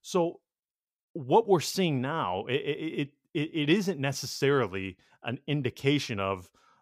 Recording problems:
none

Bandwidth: 15.5 kHz